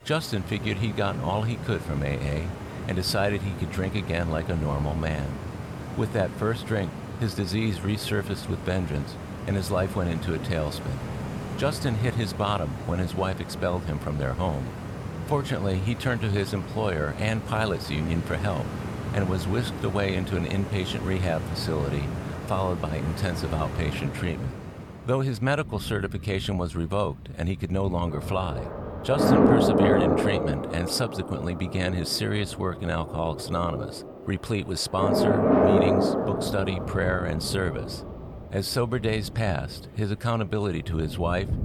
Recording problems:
rain or running water; loud; throughout; 2 dB below the speech

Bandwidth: 18.5 kHz